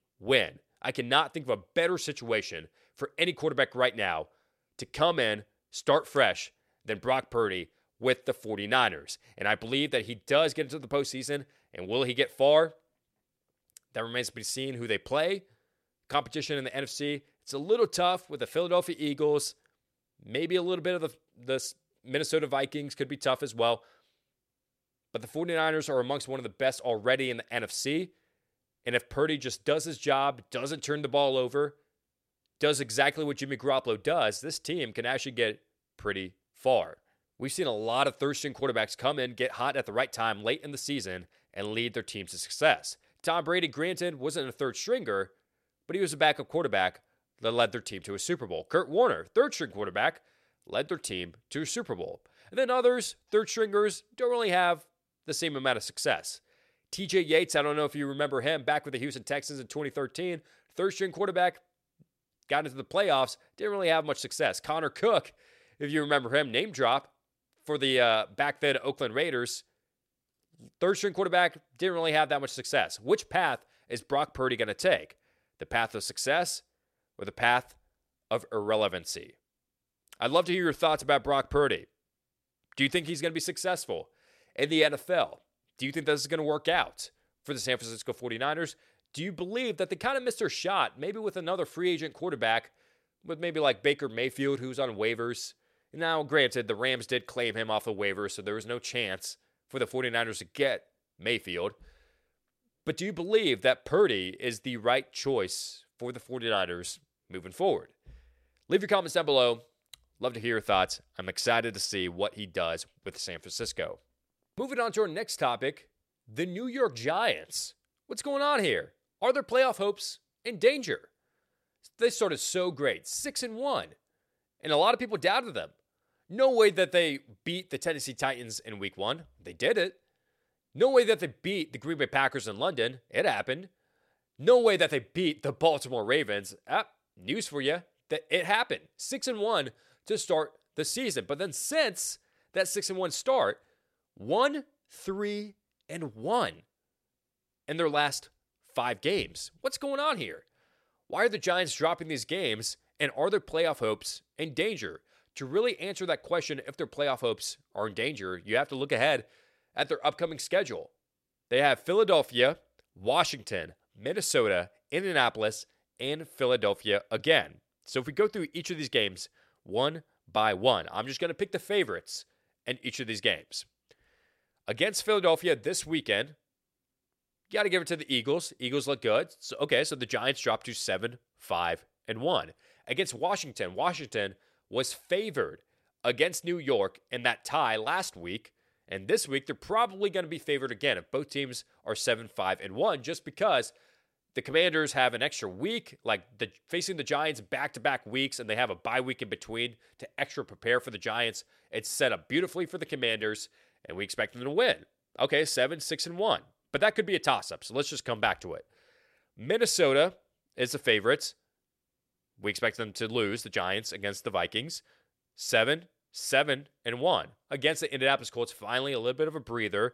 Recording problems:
none

